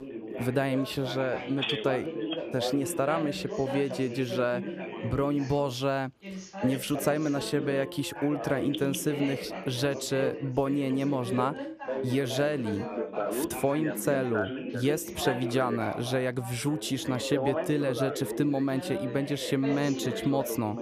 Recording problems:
background chatter; loud; throughout; 3 voices, 5 dB below the speech

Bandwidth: 14.5 kHz